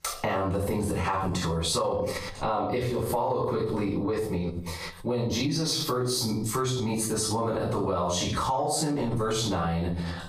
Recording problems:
off-mic speech; far
squashed, flat; heavily
room echo; noticeable; dies away in 0.4 s

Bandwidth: 15 kHz